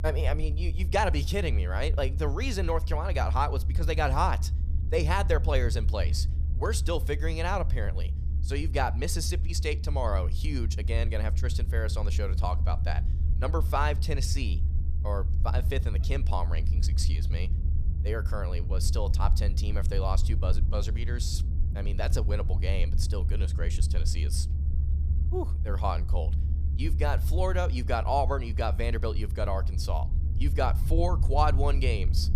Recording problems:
low rumble; noticeable; throughout; 15 dB below the speech

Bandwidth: 15 kHz